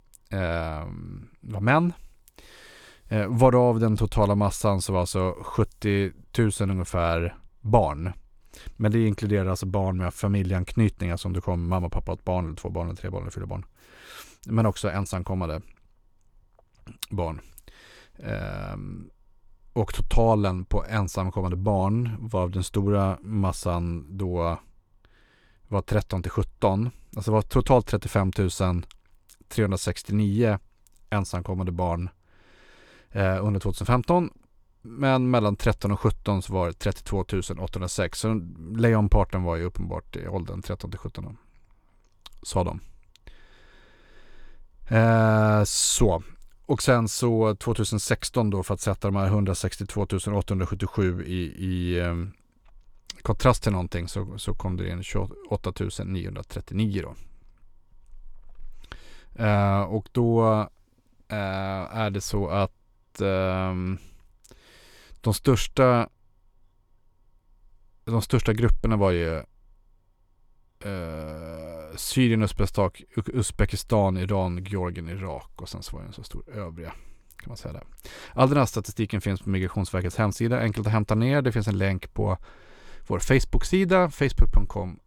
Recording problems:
none

